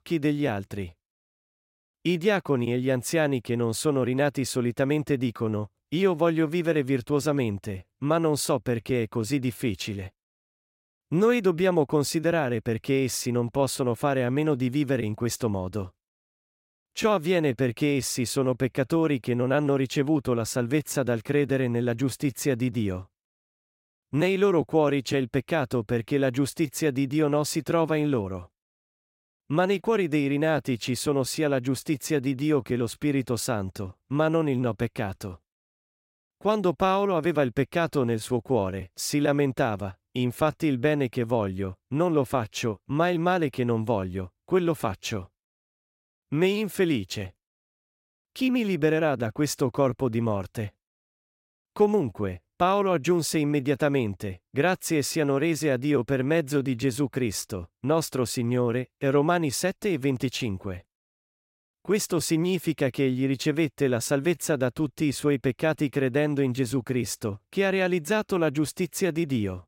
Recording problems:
none

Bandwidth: 16 kHz